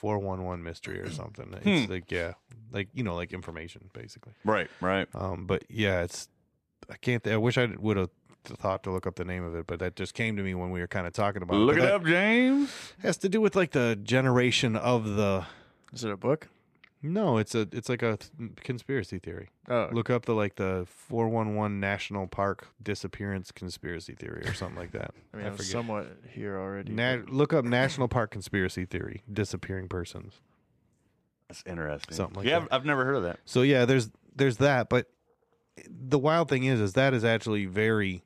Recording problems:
none

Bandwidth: 14 kHz